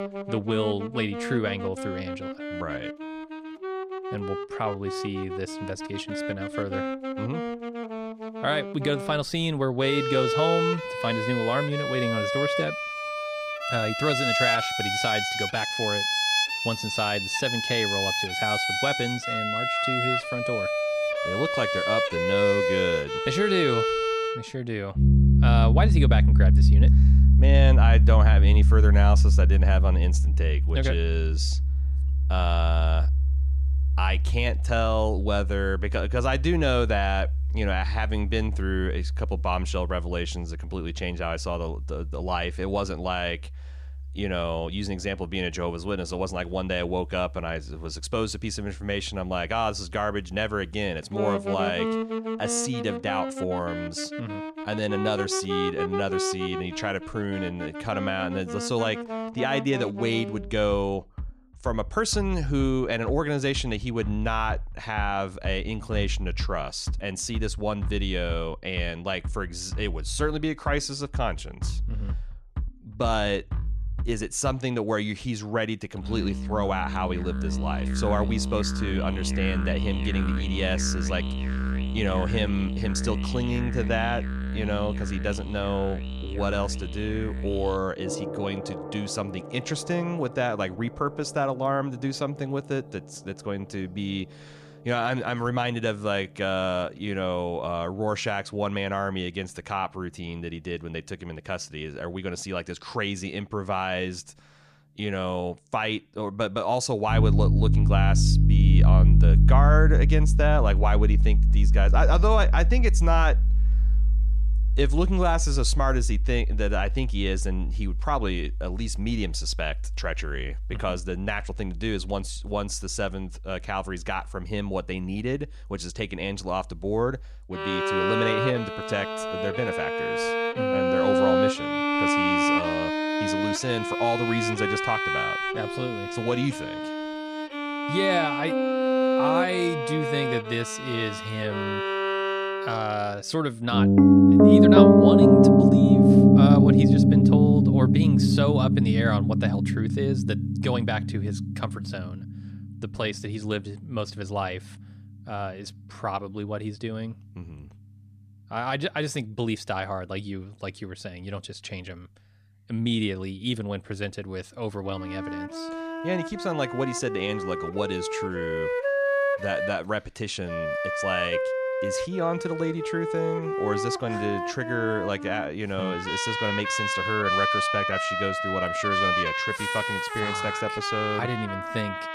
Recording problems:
background music; very loud; throughout; 5 dB above the speech

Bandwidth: 14.5 kHz